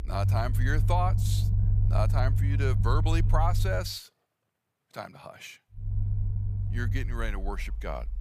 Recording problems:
low rumble; loud; until 4 s and from 6 s on; 9 dB below the speech

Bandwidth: 15 kHz